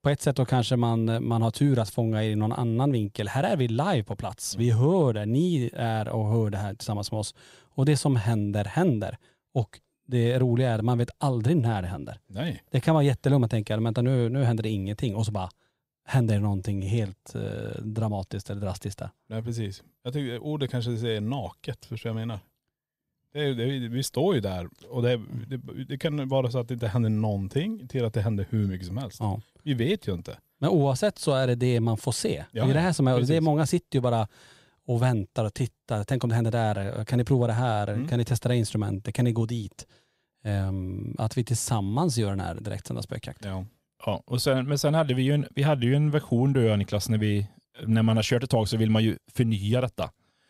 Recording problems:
none

